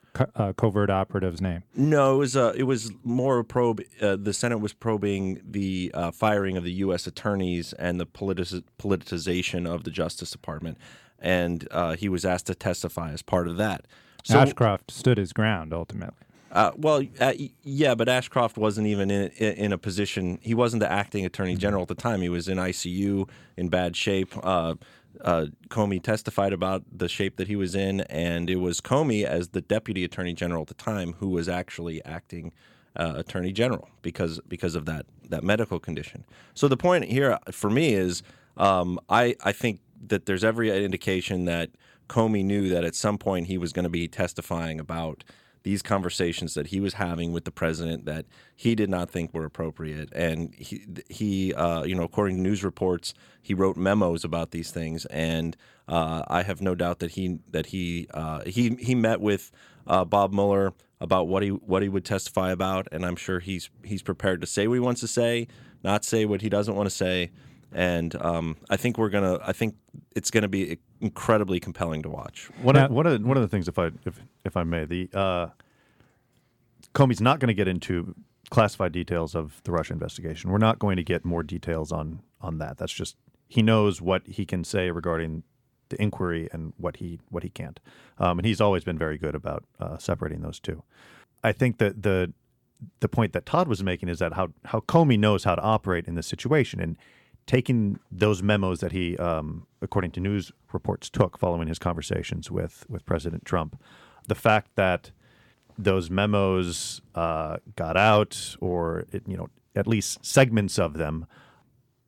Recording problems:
none

